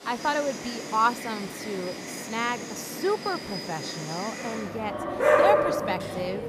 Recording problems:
animal sounds; very loud; throughout; 1 dB above the speech

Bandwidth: 15 kHz